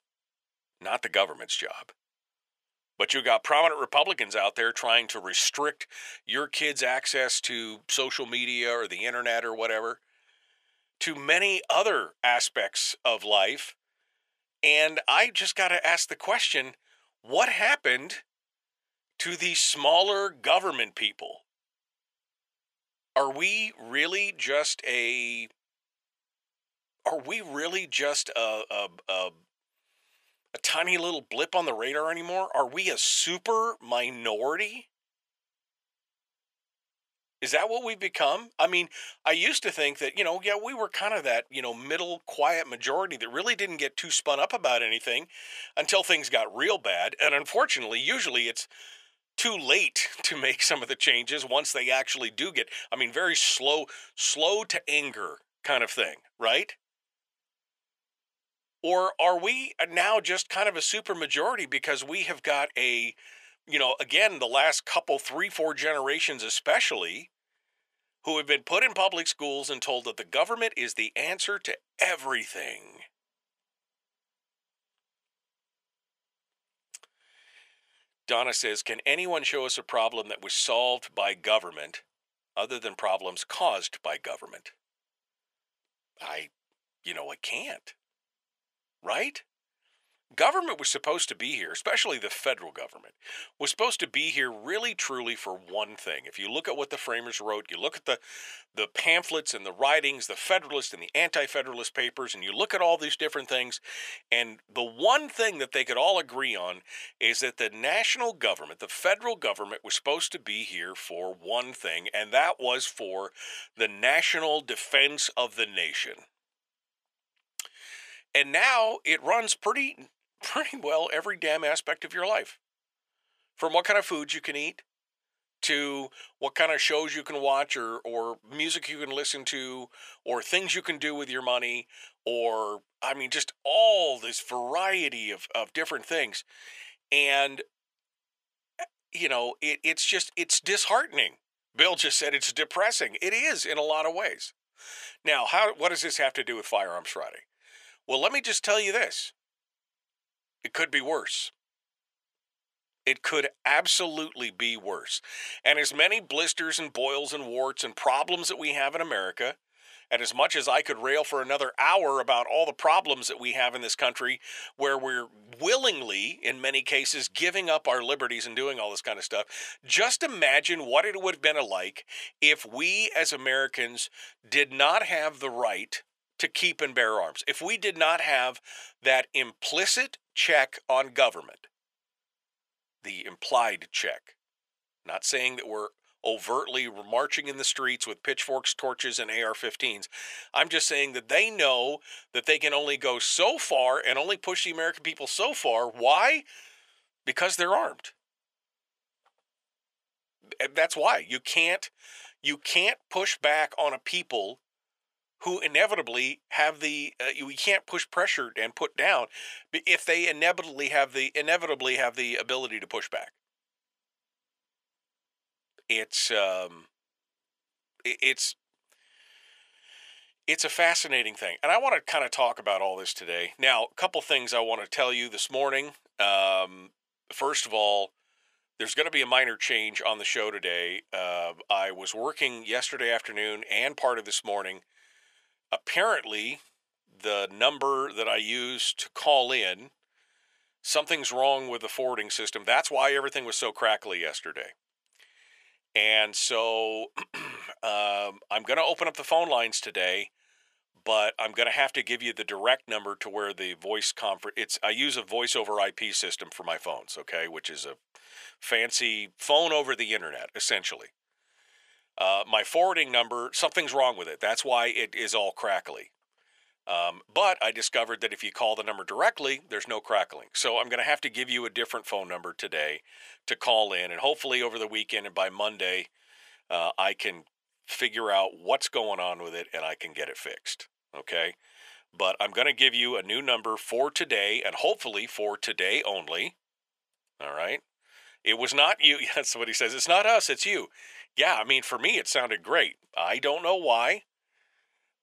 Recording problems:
thin; very; fading below 750 Hz

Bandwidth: 14.5 kHz